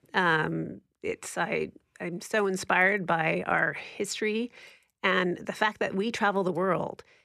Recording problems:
none

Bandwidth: 14.5 kHz